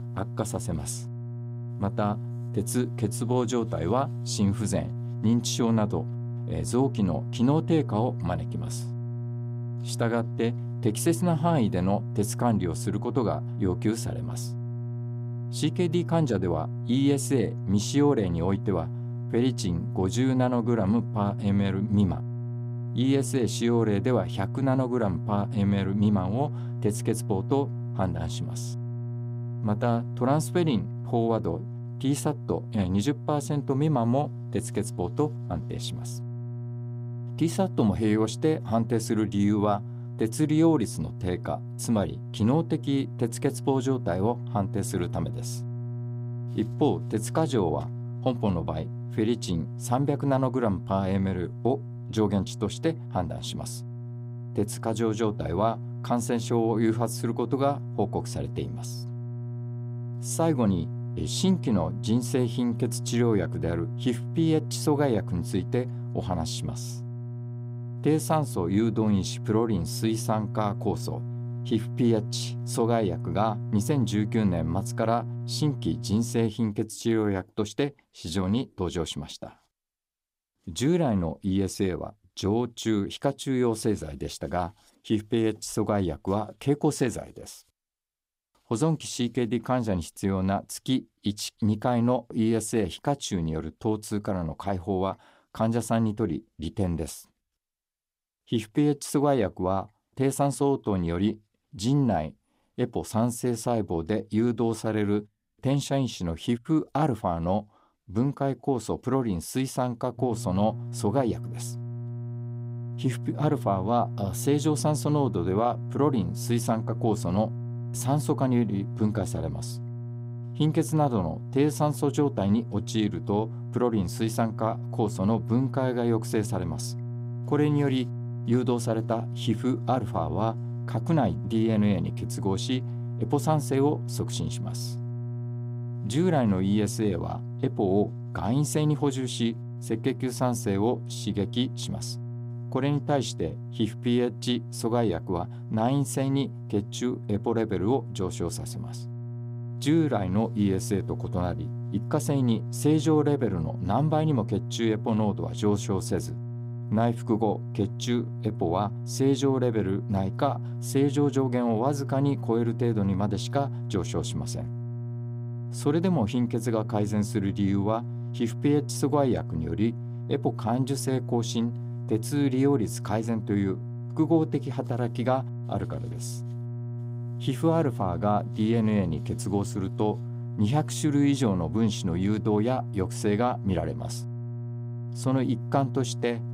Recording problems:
electrical hum; noticeable; until 1:16 and from 1:50 on; 60 Hz, 15 dB below the speech

